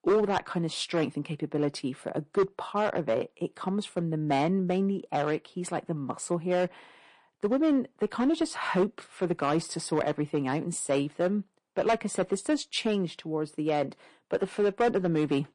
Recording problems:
distortion; slight; 4% of the sound clipped
garbled, watery; slightly; nothing above 8 kHz

